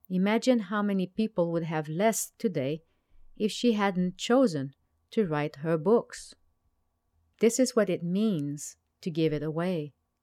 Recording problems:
none

